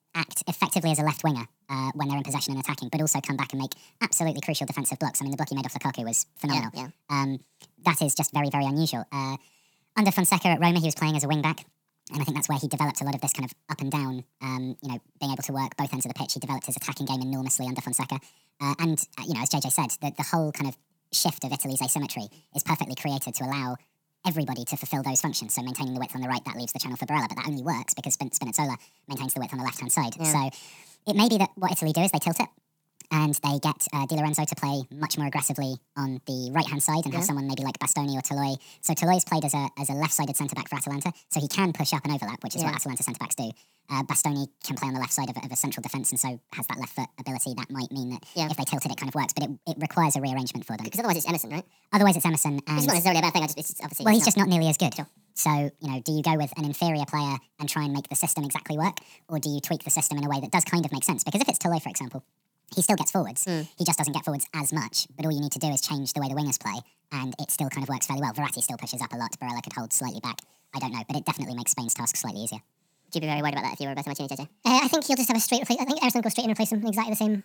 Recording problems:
wrong speed and pitch; too fast and too high; 1.6 times normal speed

